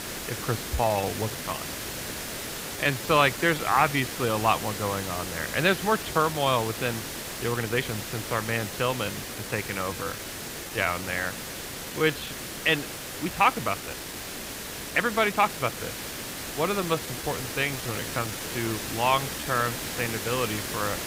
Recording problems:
muffled; slightly; fading above 3.5 kHz
hiss; loud; throughout; 6 dB below the speech
uneven, jittery; strongly; from 0.5 to 20 s

